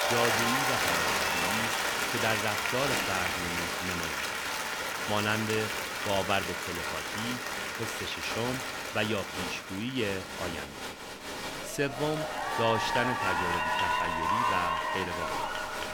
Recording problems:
crowd noise; very loud; throughout; 4 dB above the speech

